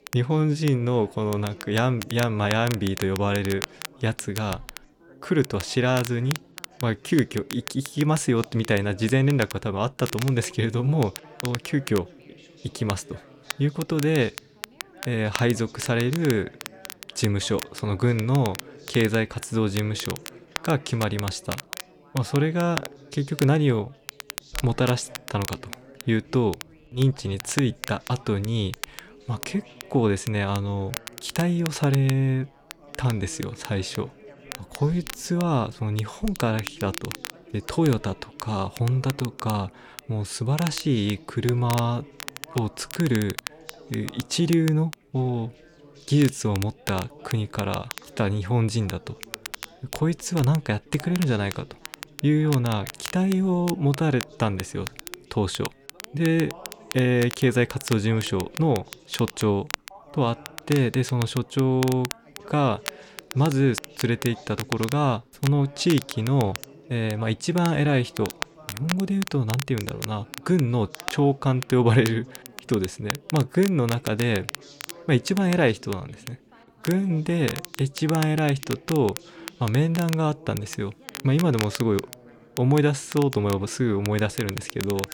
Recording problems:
crackle, like an old record; noticeable; 15 dB below the speech
background chatter; faint; throughout; 3 voices, 25 dB below the speech

